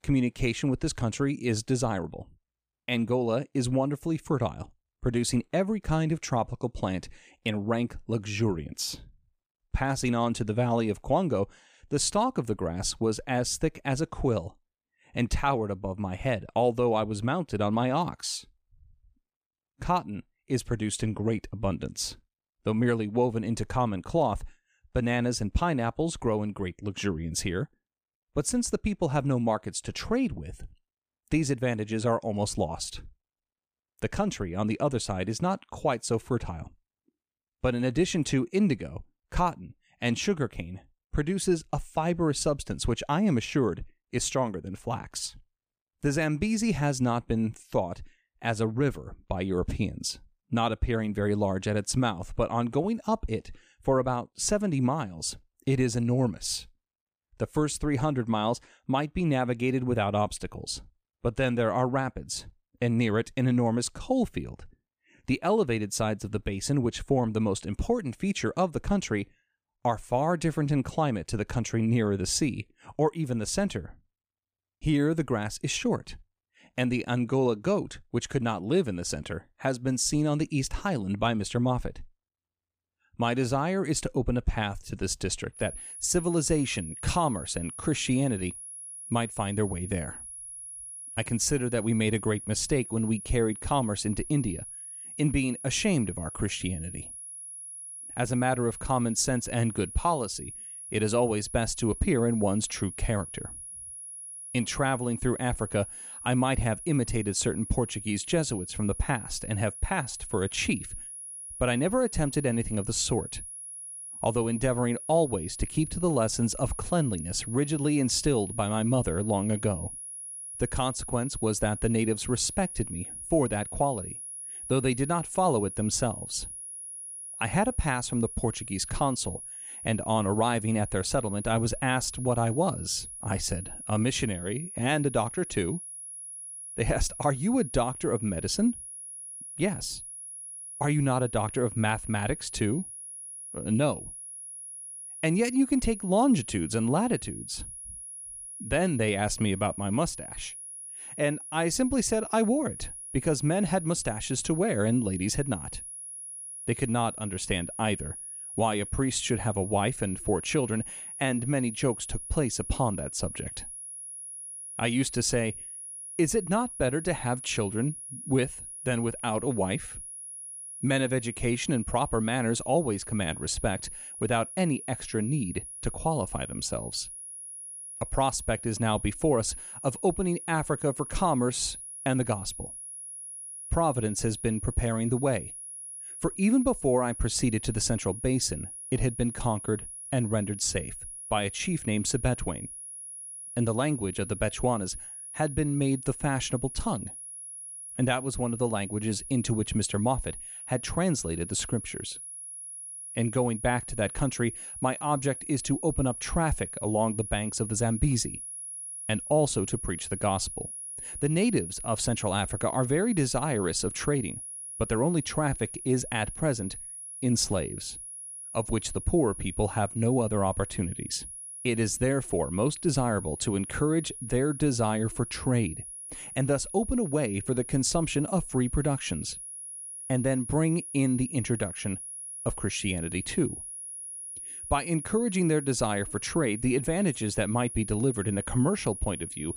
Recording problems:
high-pitched whine; loud; from 1:26 on; 10.5 kHz, 9 dB below the speech

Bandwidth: 15 kHz